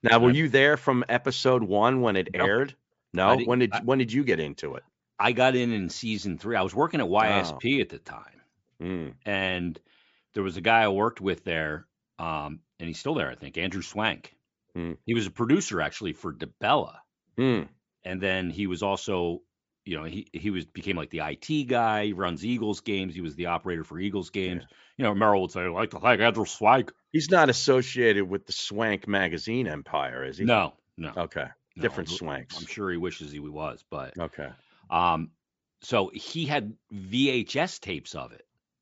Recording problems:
high frequencies cut off; noticeable; nothing above 8 kHz

